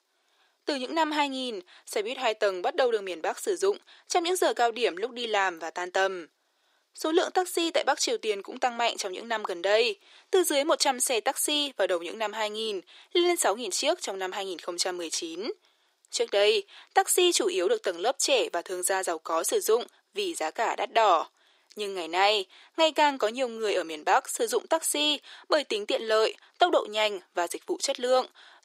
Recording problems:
thin; very; fading below 350 Hz

